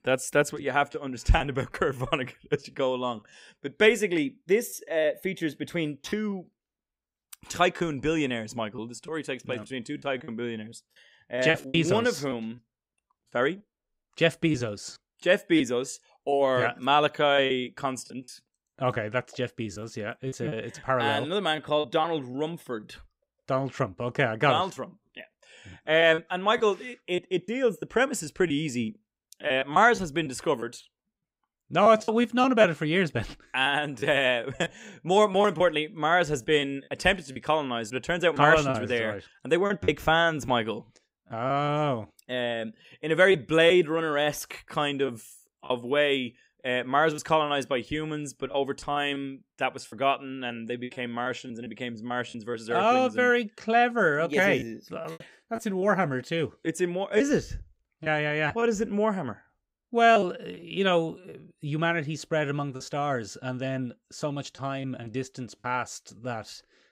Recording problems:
choppy; very; 6% of the speech affected

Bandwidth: 15.5 kHz